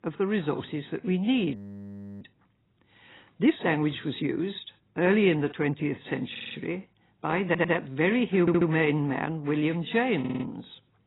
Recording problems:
garbled, watery; badly; nothing above 4 kHz
audio freezing; at 1.5 s for 0.5 s
audio stuttering; 4 times, first at 6.5 s

